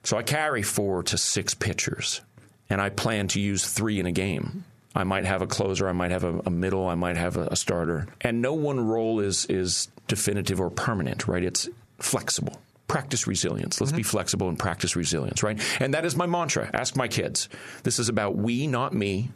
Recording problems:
squashed, flat; heavily

